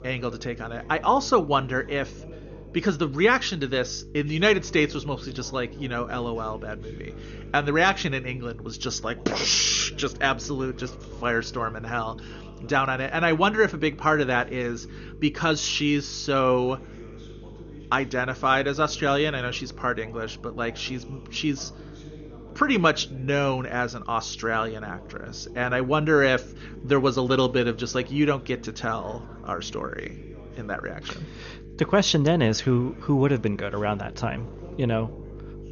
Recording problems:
garbled, watery; slightly; nothing above 6.5 kHz
electrical hum; faint; throughout; 50 Hz, 25 dB below the speech
voice in the background; faint; throughout; 20 dB below the speech

